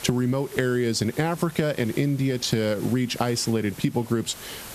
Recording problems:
squashed, flat; somewhat
hiss; noticeable; throughout; 20 dB below the speech

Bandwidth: 14 kHz